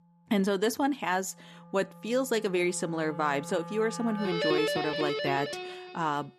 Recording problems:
background music; loud; throughout; 4 dB below the speech

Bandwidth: 13.5 kHz